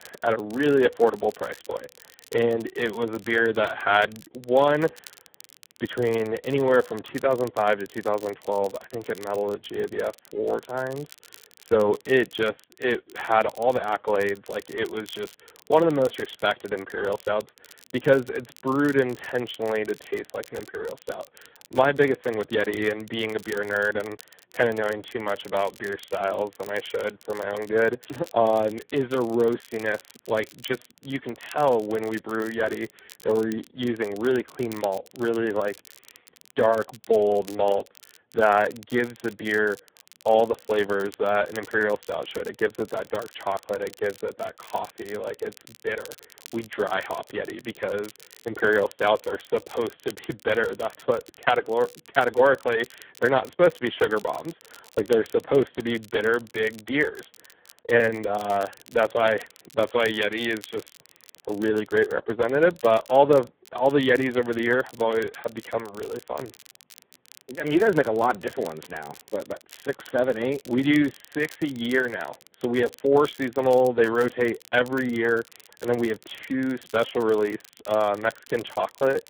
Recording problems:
phone-call audio; poor line
crackle, like an old record; faint; 25 dB below the speech

